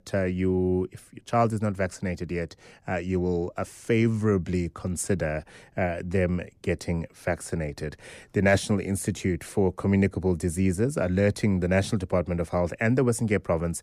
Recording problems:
none

